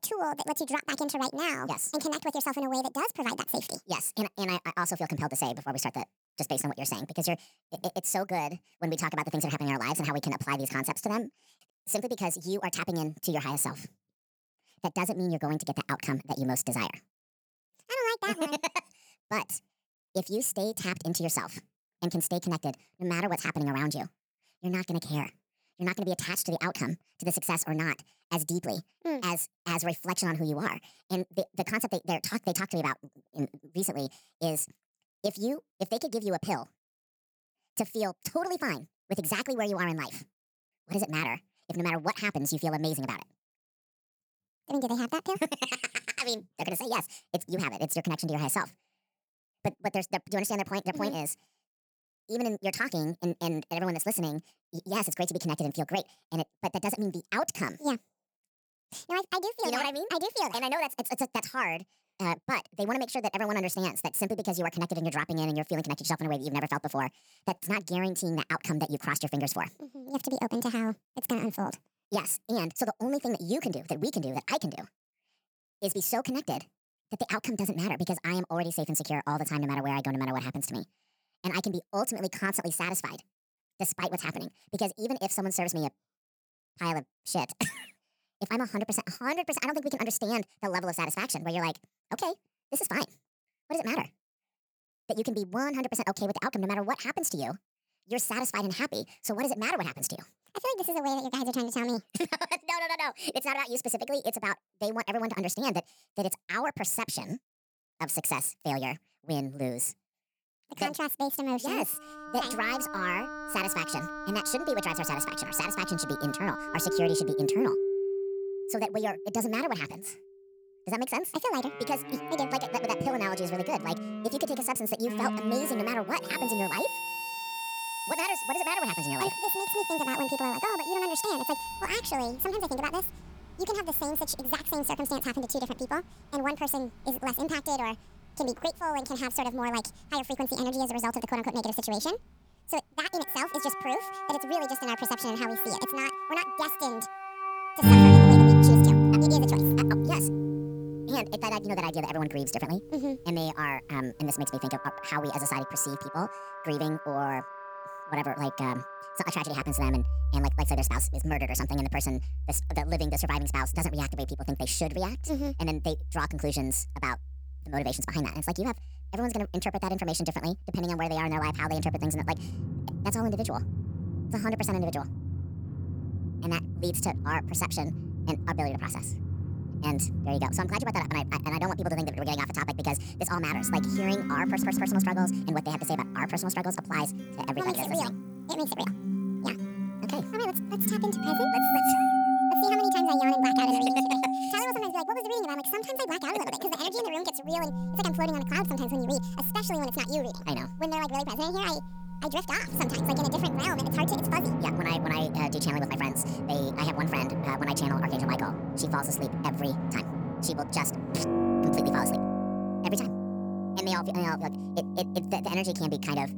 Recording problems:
wrong speed and pitch; too fast and too high; 1.6 times normal speed
background music; very loud; from 1:52 on; 3 dB above the speech
audio stuttering; at 3:04

